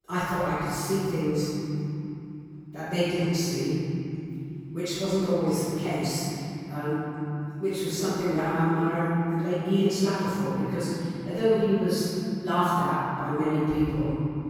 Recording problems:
room echo; strong; dies away in 3 s
off-mic speech; far

